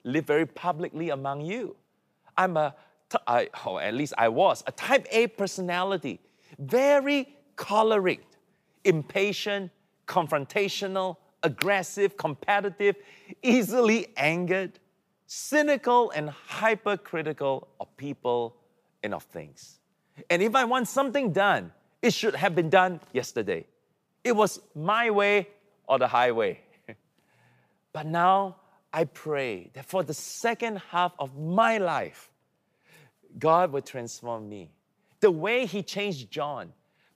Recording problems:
none

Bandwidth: 15 kHz